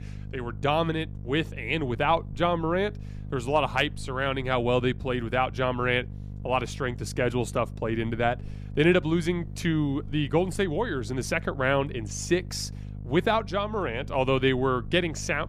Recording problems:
electrical hum; faint; throughout; 50 Hz, 25 dB below the speech

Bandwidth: 15 kHz